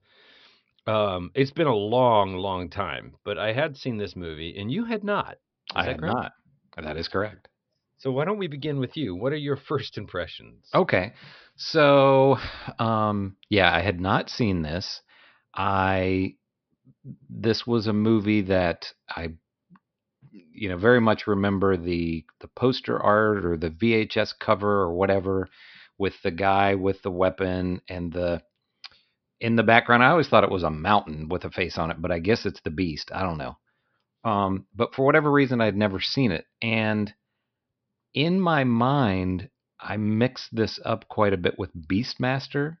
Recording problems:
high frequencies cut off; noticeable; nothing above 5.5 kHz

